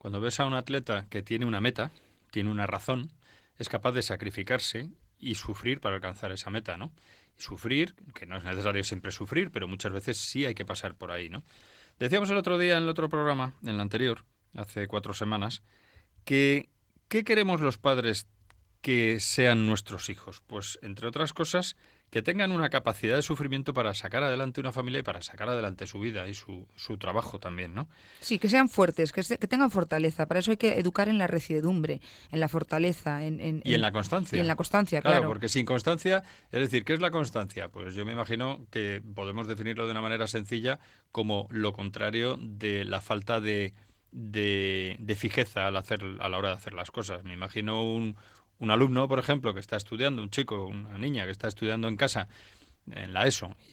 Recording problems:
garbled, watery; slightly; nothing above 19 kHz

